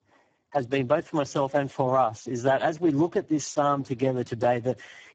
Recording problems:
garbled, watery; badly

